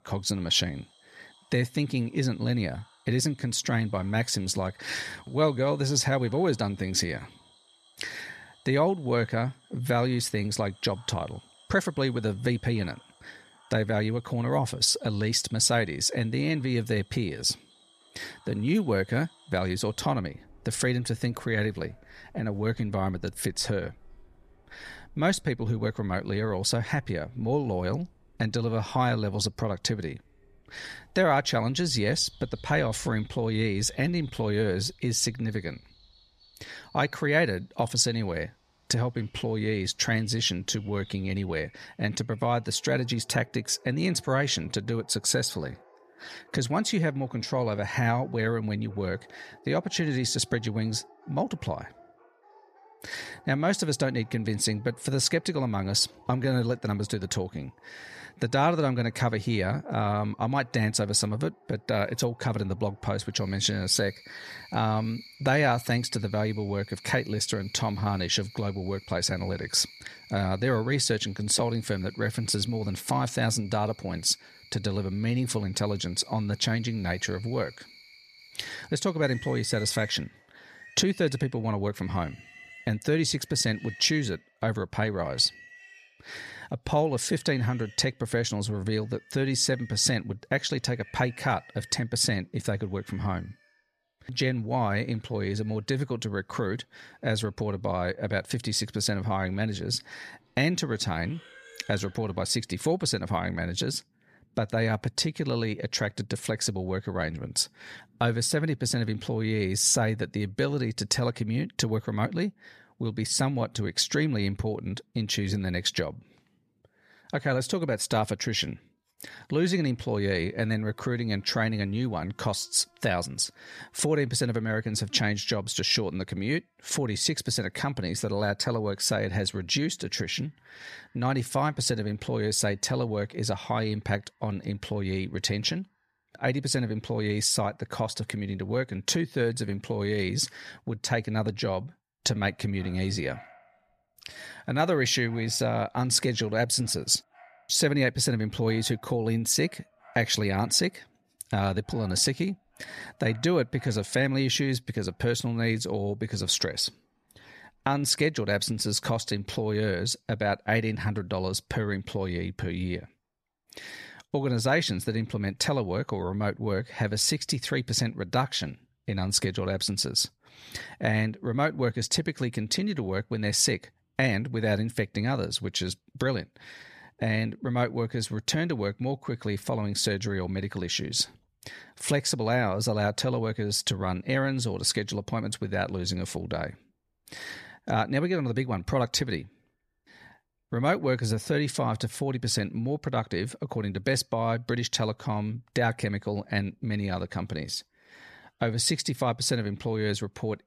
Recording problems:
animal sounds; faint; throughout; 25 dB below the speech

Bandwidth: 14.5 kHz